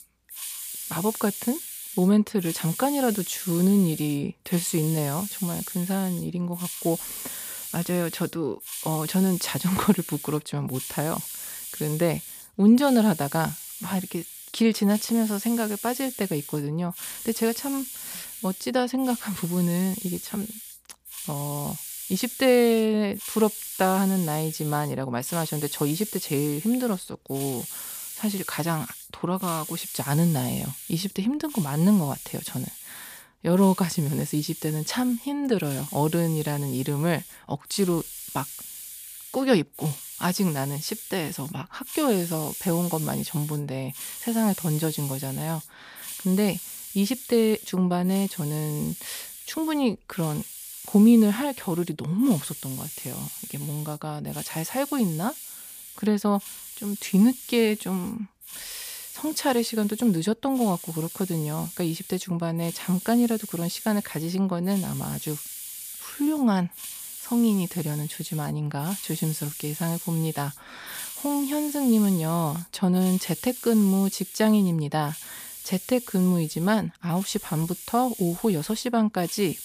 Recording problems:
hiss; loud; throughout; 10 dB below the speech

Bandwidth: 15 kHz